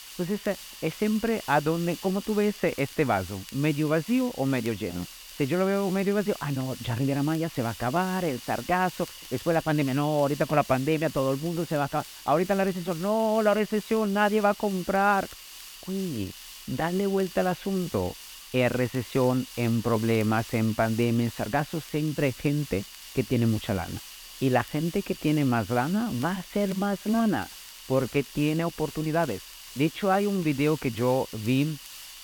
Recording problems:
high frequencies cut off; severe; nothing above 4 kHz
hiss; noticeable; throughout; 15 dB below the speech
crackle, like an old record; faint; 25 dB below the speech

